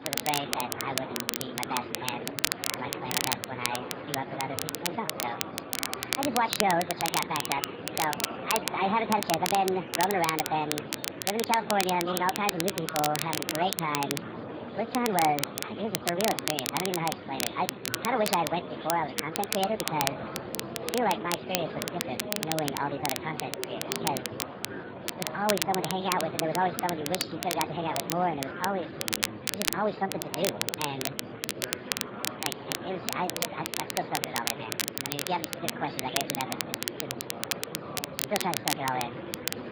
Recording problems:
garbled, watery; badly
wrong speed and pitch; too fast and too high; 1.6 times normal speed
murmuring crowd; loud; throughout; 8 dB below the speech
crackle, like an old record; loud; 2 dB below the speech
household noises; faint; throughout; 25 dB below the speech

